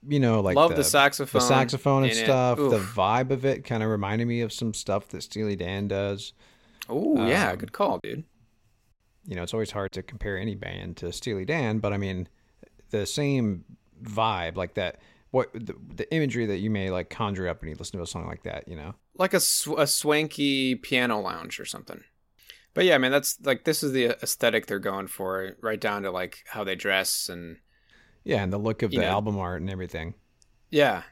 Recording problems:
choppy; occasionally; from 8 to 10 s; 1% of the speech affected

